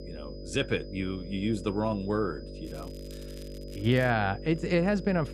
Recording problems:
electrical hum; noticeable; throughout; 50 Hz, 15 dB below the speech
high-pitched whine; faint; throughout; 5 kHz, 25 dB below the speech
crackling; faint; from 2.5 to 4 s; 25 dB below the speech

